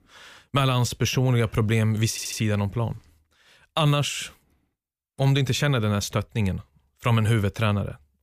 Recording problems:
audio stuttering; at 2 s

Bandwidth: 15 kHz